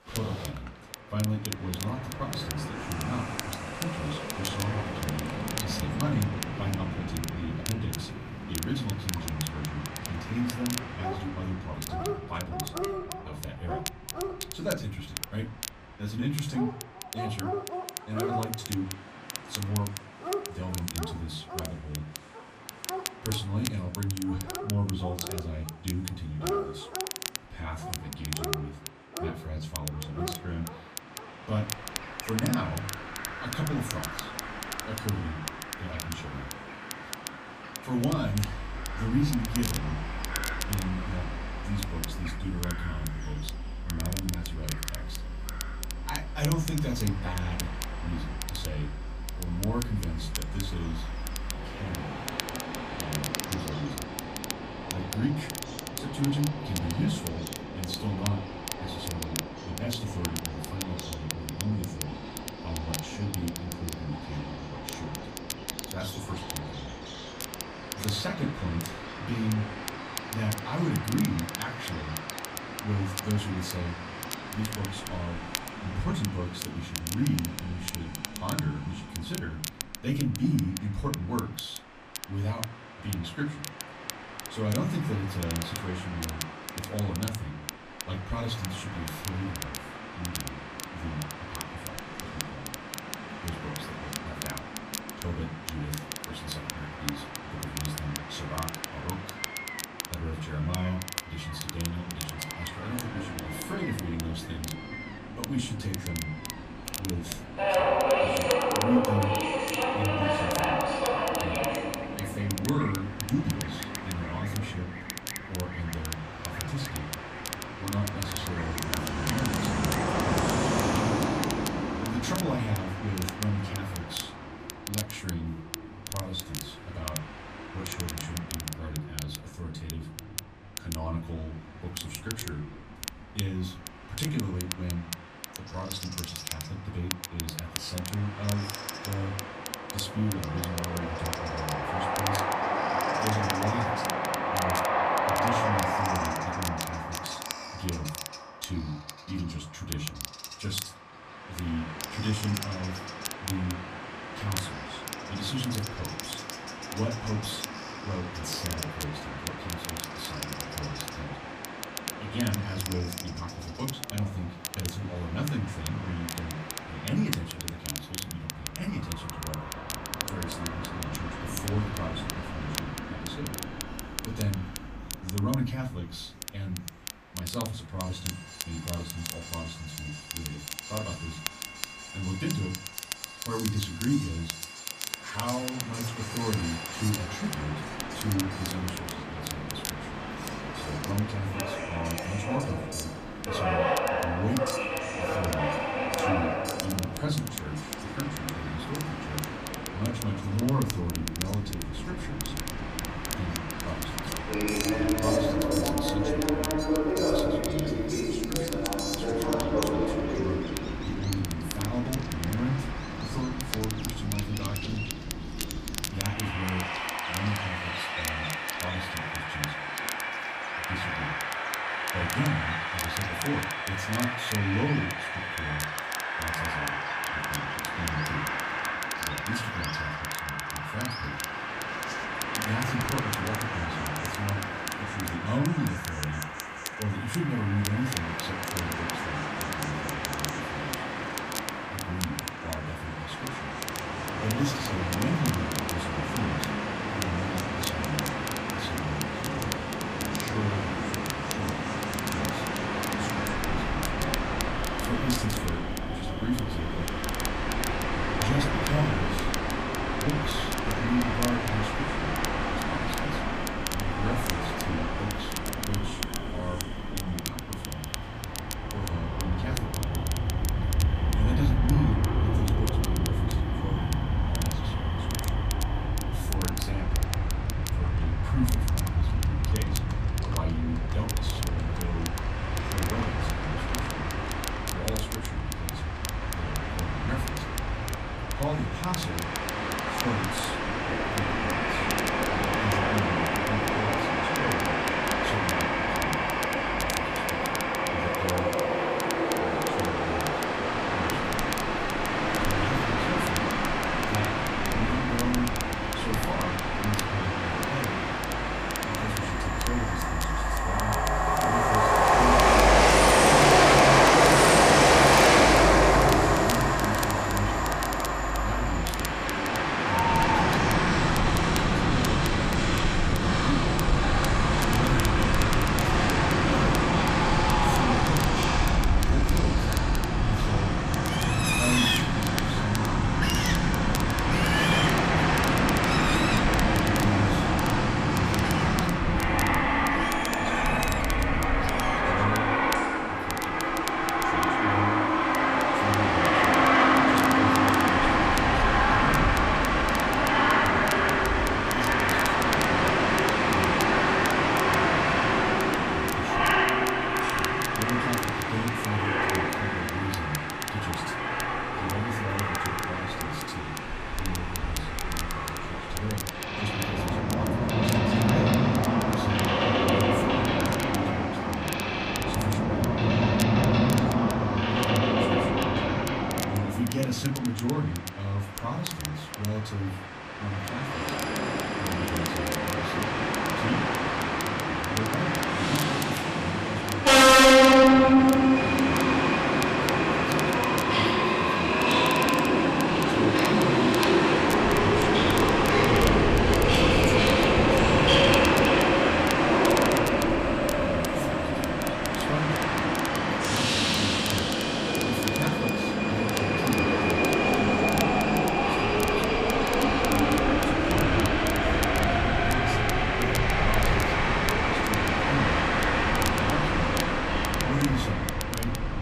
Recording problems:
off-mic speech; far
distortion; slight; 10 dB below the speech
room echo; very slight; dies away in 0.3 s
train or aircraft noise; very loud; throughout; 8 dB above the speech
animal sounds; loud; throughout; 7 dB below the speech
crackle, like an old record; loud; 5 dB below the speech

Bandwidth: 14.5 kHz